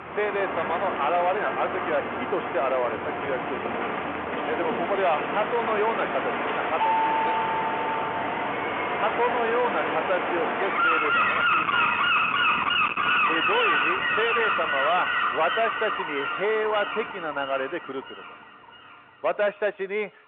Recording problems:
distortion; heavy; 7 dB below the speech
phone-call audio
animal sounds; very loud; throughout; 2 dB above the speech
traffic noise; loud; throughout; 9 dB below the speech
doorbell; loud; from 7 to 8.5 s; peak 5 dB above the speech

